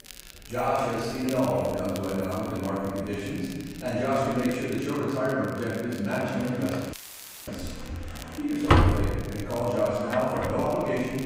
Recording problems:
room echo; strong; dies away in 1.5 s
off-mic speech; far
household noises; loud; throughout; 1 dB below the speech
crackle, like an old record; noticeable; 20 dB below the speech
chatter from many people; faint; throughout; 25 dB below the speech
audio cutting out; filled with static; at 7 s for 0.5 s

